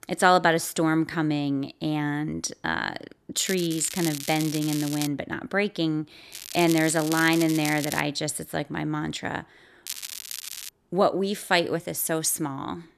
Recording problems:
crackling; loud; from 3.5 to 5 s, from 6.5 to 8 s and at 10 s; 9 dB below the speech

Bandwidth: 14 kHz